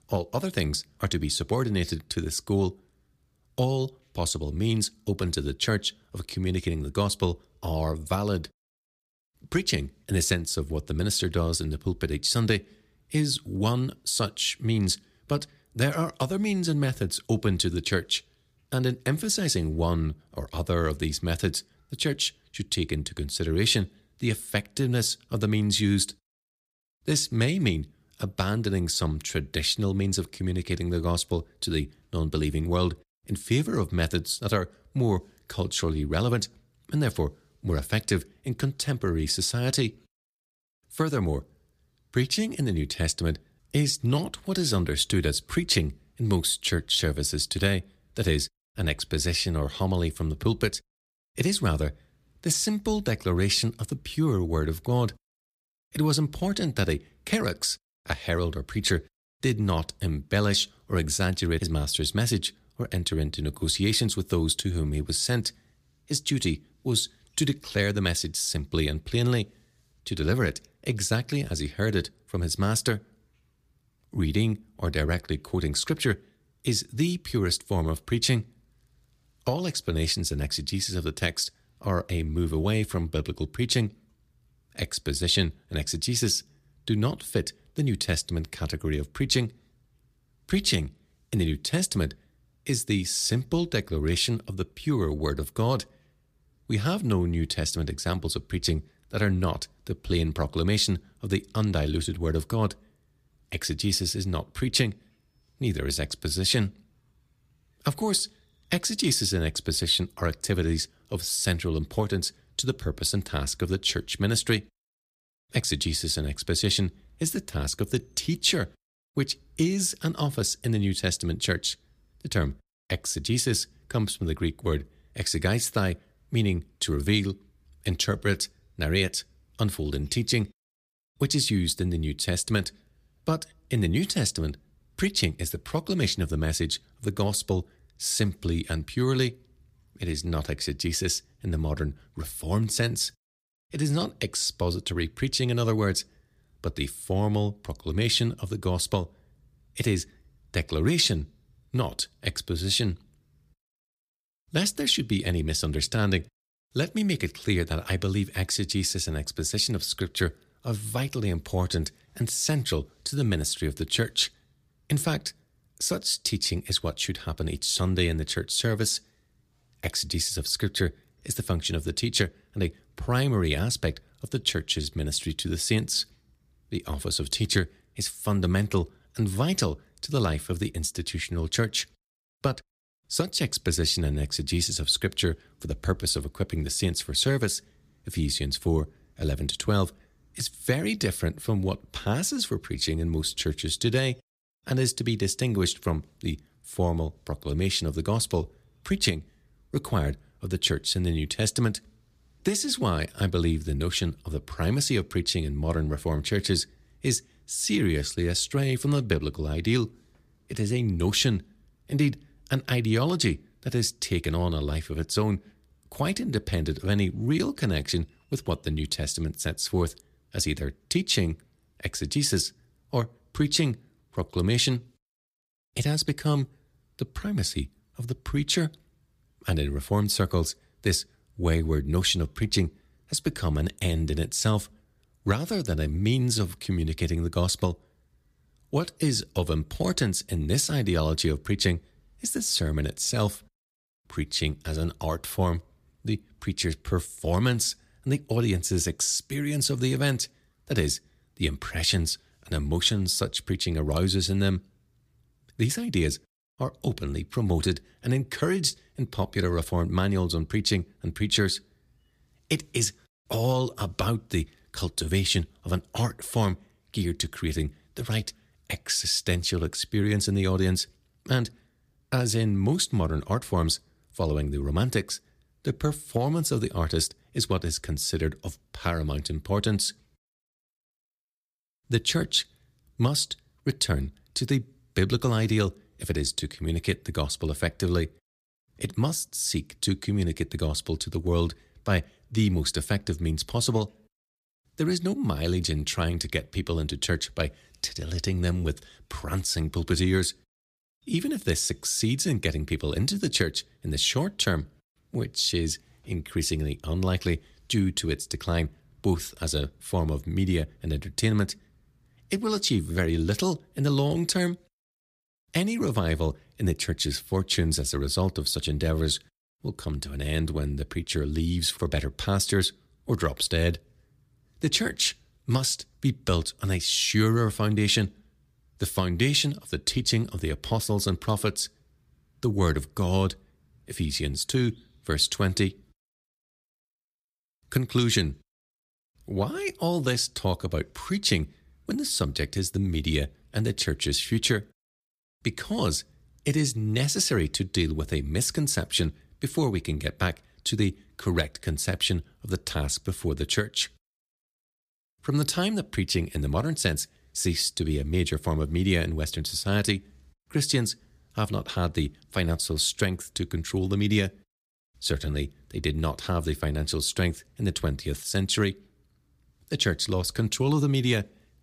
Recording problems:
none

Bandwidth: 15 kHz